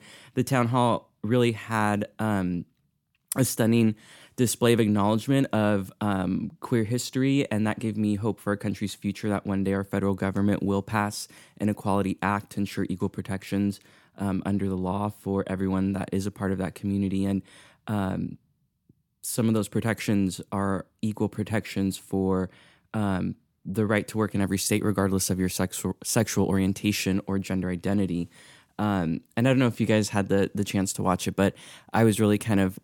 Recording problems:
none

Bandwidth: 17.5 kHz